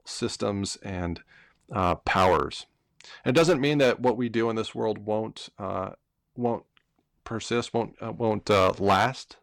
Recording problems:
distortion; slight; 2% of the sound clipped

